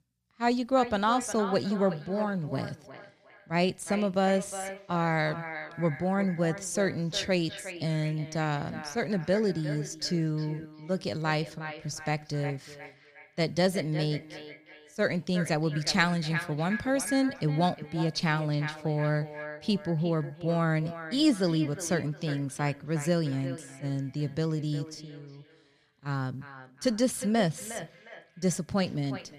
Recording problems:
echo of what is said; noticeable; throughout; 360 ms later, 10 dB below the speech

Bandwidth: 14.5 kHz